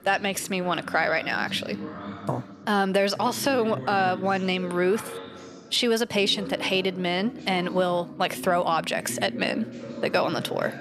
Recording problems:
background chatter; noticeable; throughout; 4 voices, 15 dB below the speech

